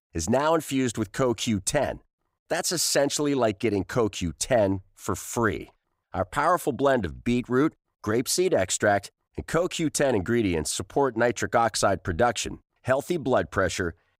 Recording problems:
none

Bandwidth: 15.5 kHz